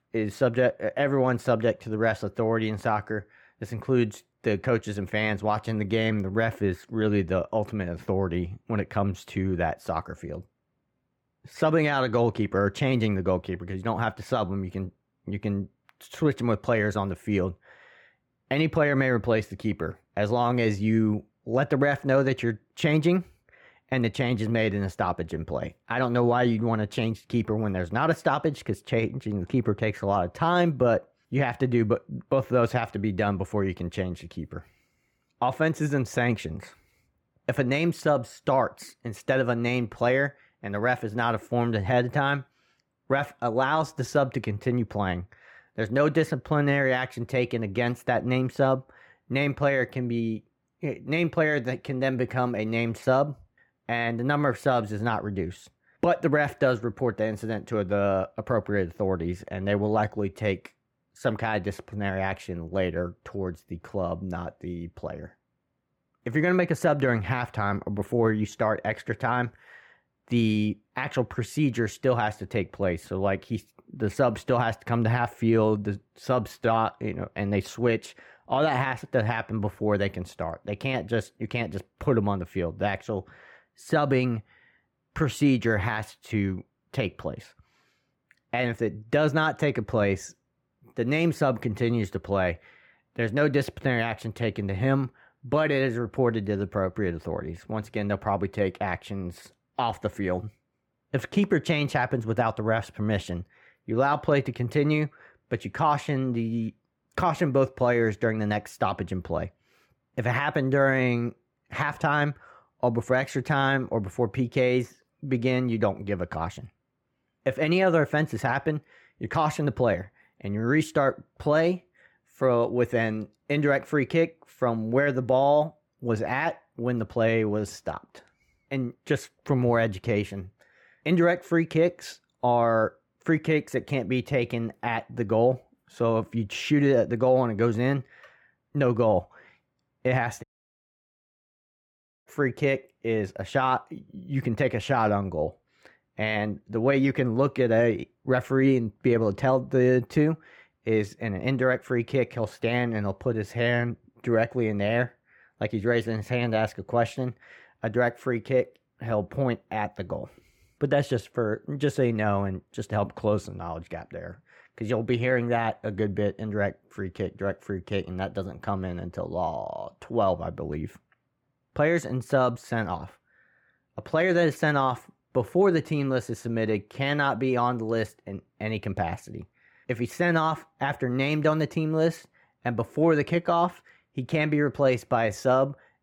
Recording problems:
muffled; slightly; fading above 3.5 kHz
audio cutting out; at 2:20 for 2 s

